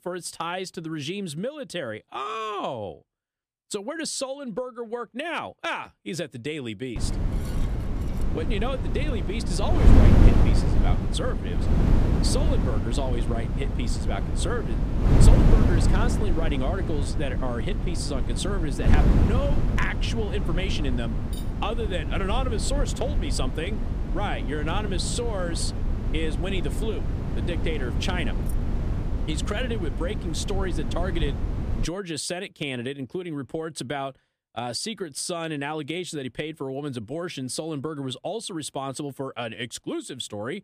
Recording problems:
wind noise on the microphone; heavy; from 7 to 32 s; 4 dB below the speech
clattering dishes; faint; from 7 to 8 s and at 21 s; peak 15 dB below the speech
jangling keys; faint; at 28 s; peak 15 dB below the speech

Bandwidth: 15 kHz